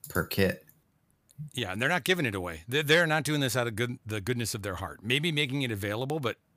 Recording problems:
none

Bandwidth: 15 kHz